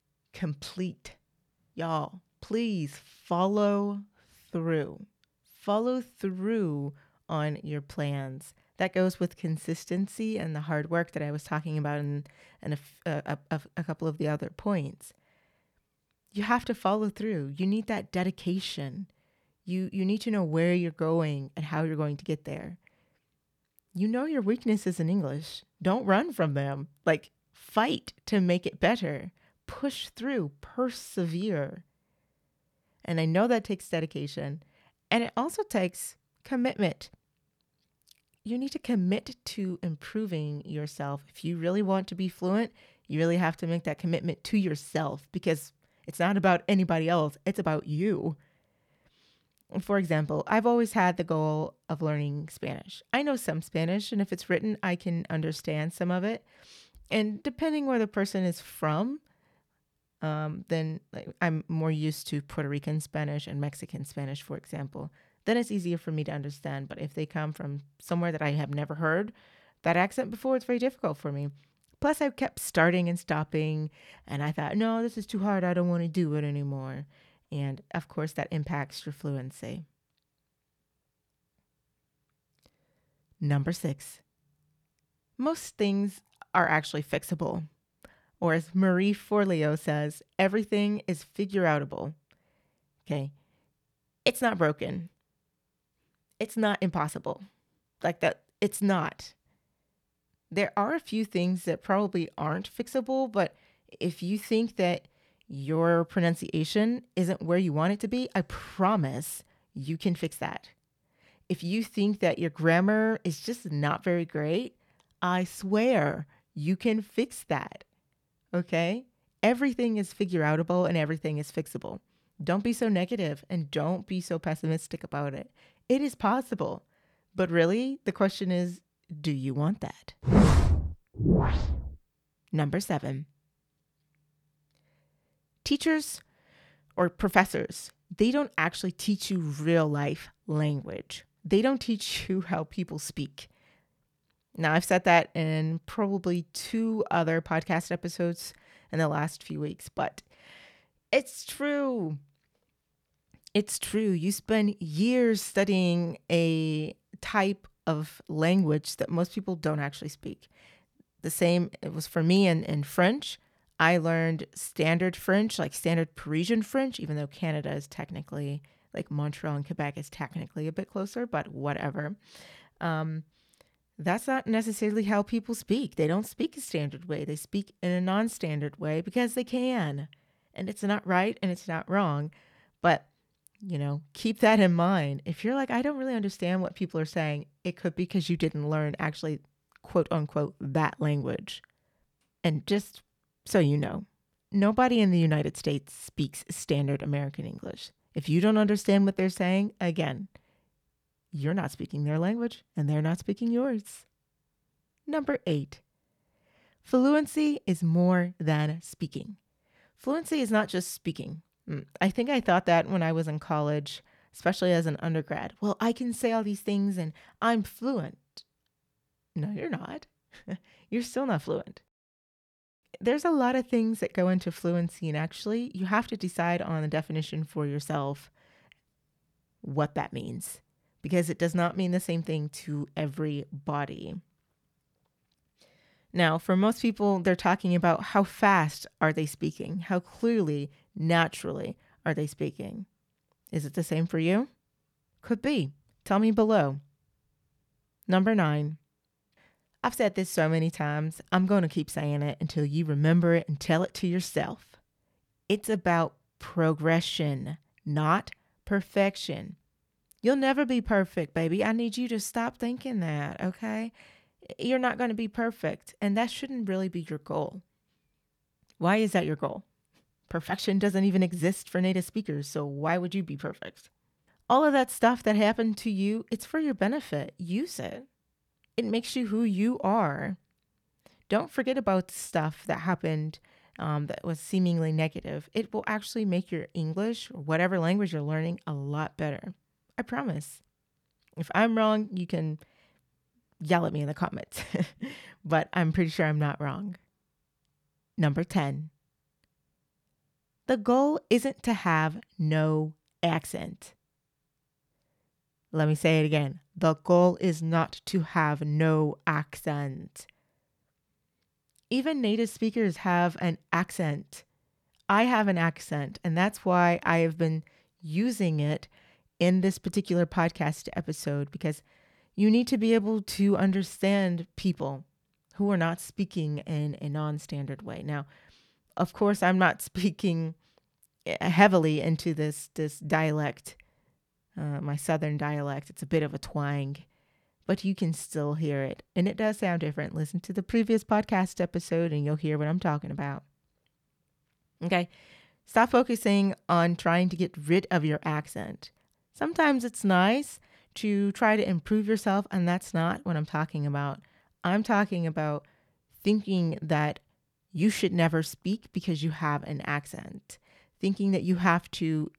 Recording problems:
none

